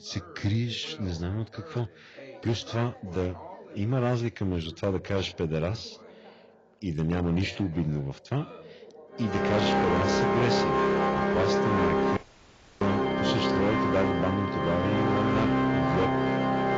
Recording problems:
garbled, watery; badly
distortion; slight; 9% of the sound clipped
background music; very loud; from 9.5 s on; 4 dB above the speech
background chatter; noticeable; throughout; 2 voices, 20 dB below the speech
audio cutting out; at 12 s for 0.5 s

